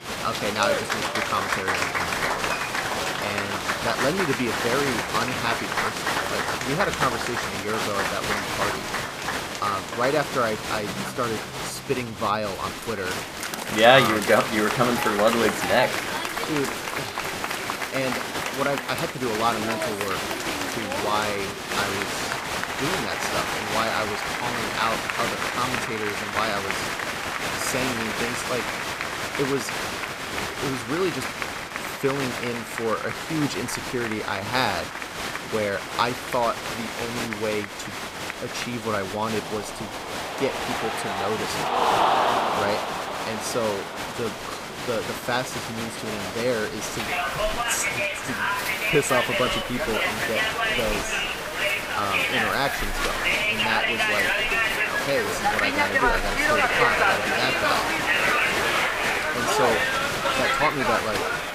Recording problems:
crowd noise; very loud; throughout; 2 dB above the speech
high-pitched whine; faint; throughout; 2 kHz, 20 dB below the speech

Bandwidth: 15 kHz